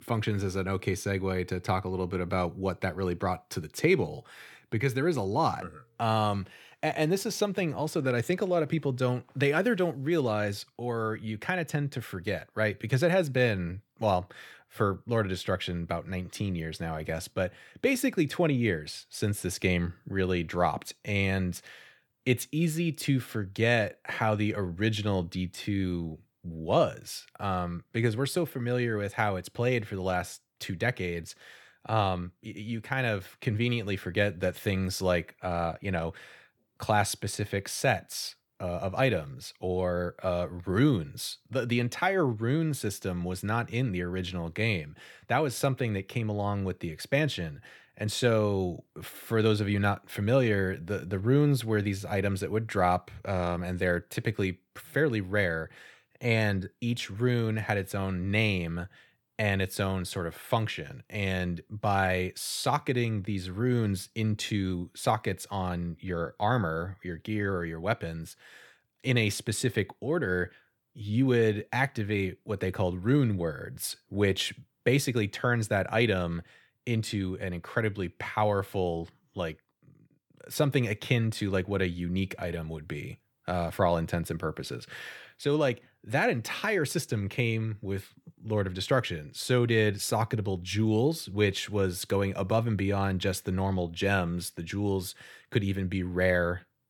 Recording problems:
none

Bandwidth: 18.5 kHz